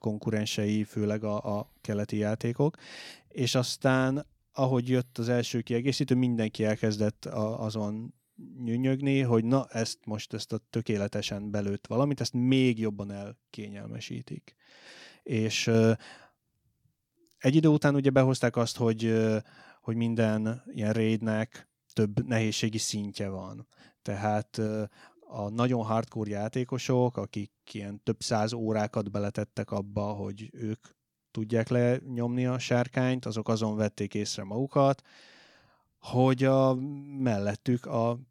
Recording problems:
none

